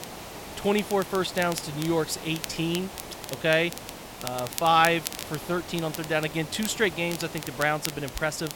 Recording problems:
hiss; noticeable; throughout; 15 dB below the speech
crackle, like an old record; noticeable; 10 dB below the speech

